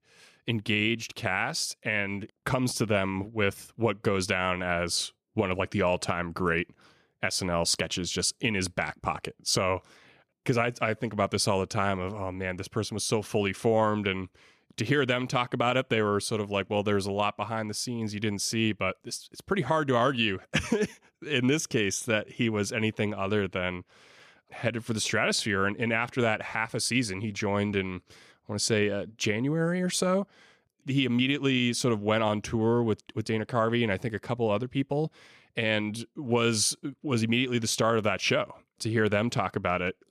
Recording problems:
none

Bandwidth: 14.5 kHz